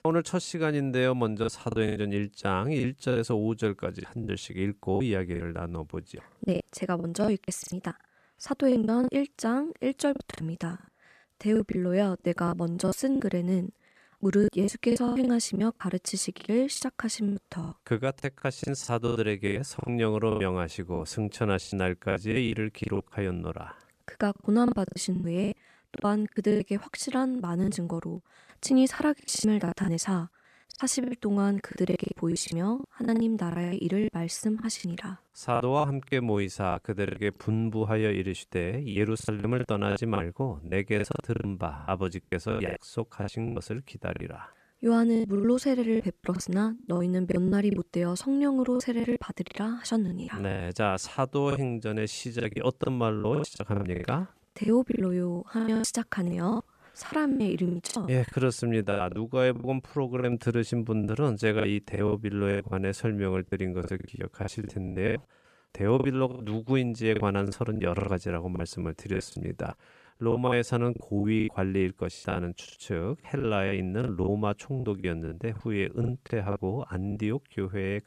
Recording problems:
choppy; very; 14% of the speech affected

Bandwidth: 14 kHz